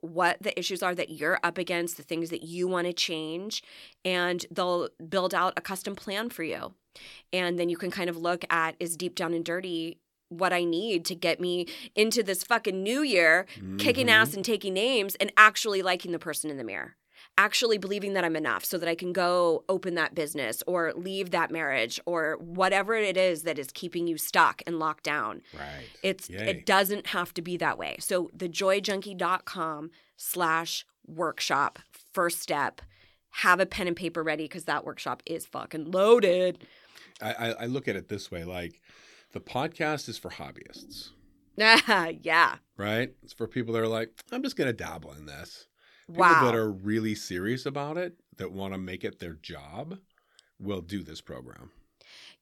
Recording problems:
none

